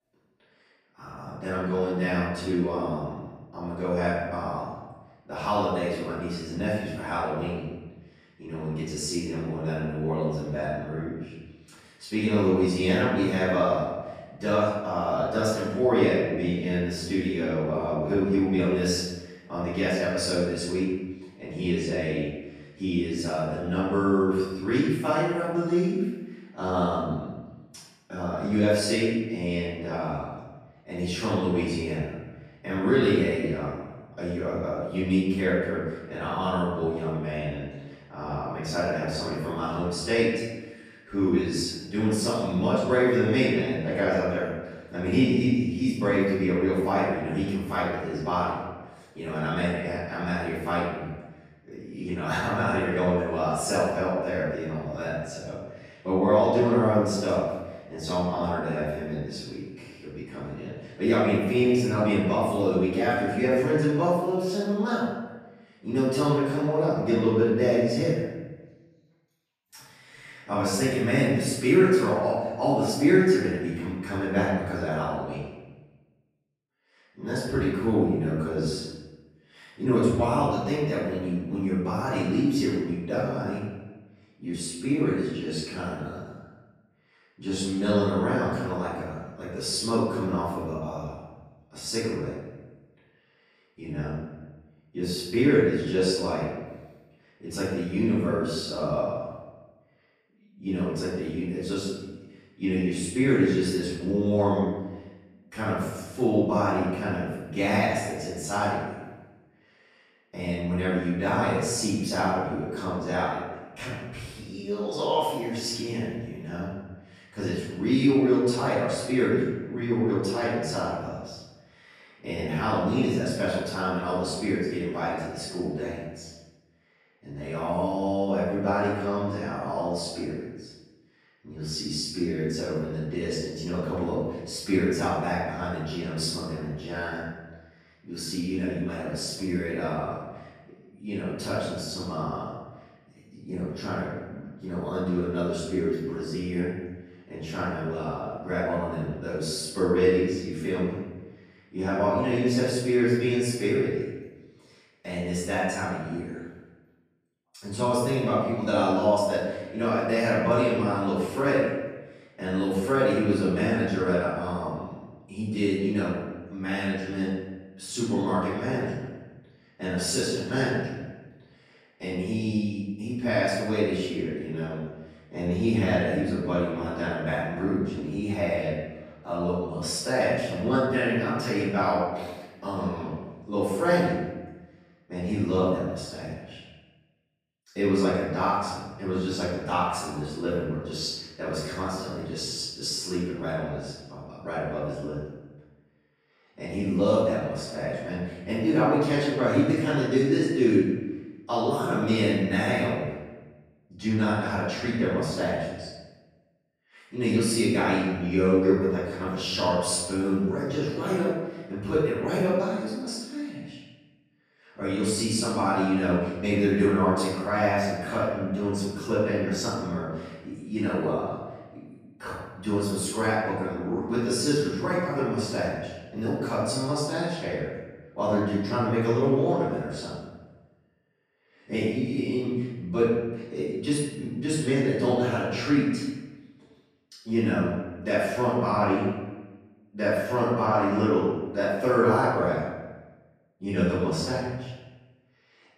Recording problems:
room echo; strong; dies away in 1 s
off-mic speech; far

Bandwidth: 14.5 kHz